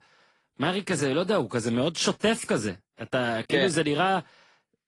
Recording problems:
garbled, watery; slightly; nothing above 10.5 kHz

